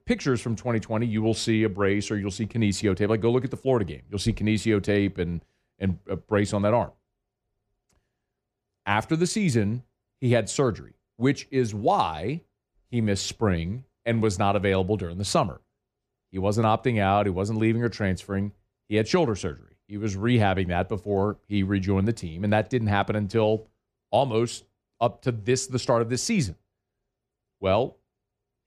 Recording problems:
none

